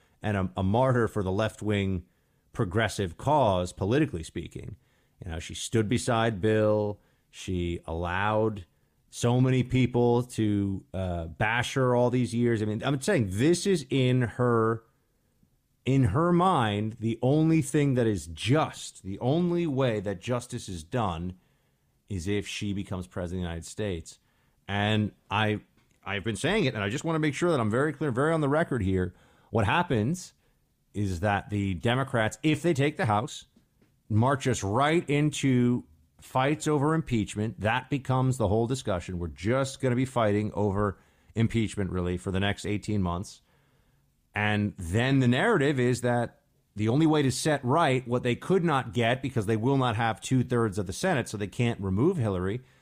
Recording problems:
uneven, jittery; strongly; from 8 to 50 s

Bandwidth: 15 kHz